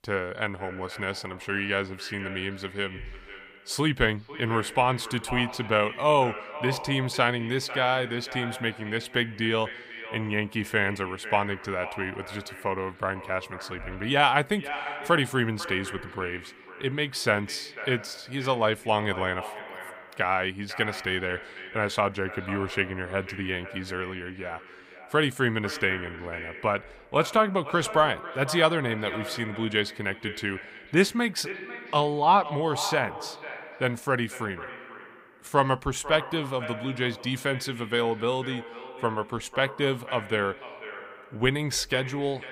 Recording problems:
echo of what is said; noticeable; throughout; 500 ms later, 10 dB below the speech

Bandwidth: 15.5 kHz